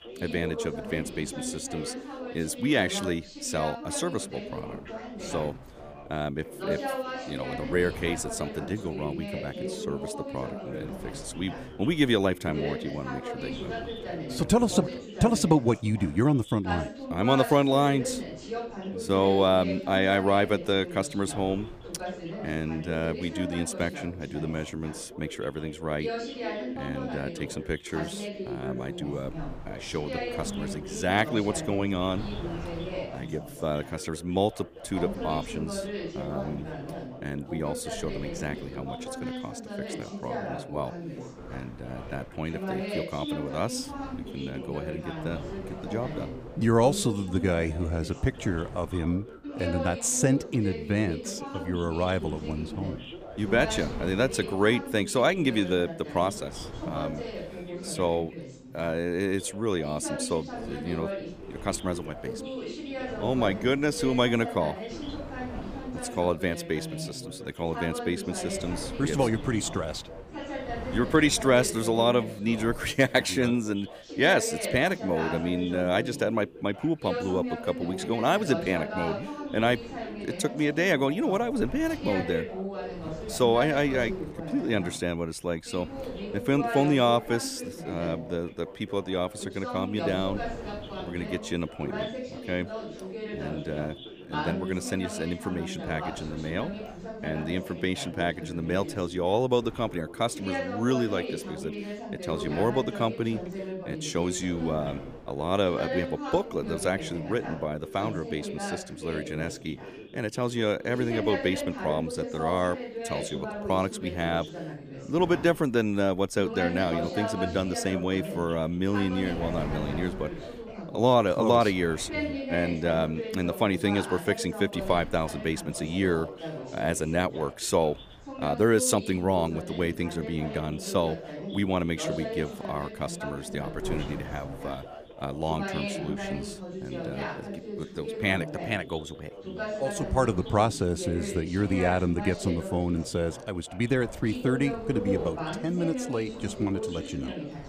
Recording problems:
background chatter; loud; throughout; 2 voices, 8 dB below the speech
wind noise on the microphone; occasional gusts; 20 dB below the speech

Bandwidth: 15 kHz